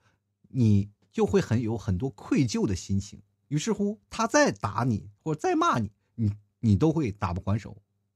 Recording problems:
none

